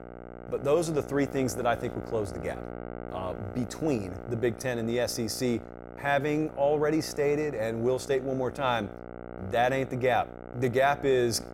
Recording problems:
electrical hum; noticeable; throughout; 60 Hz, 15 dB below the speech

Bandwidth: 16 kHz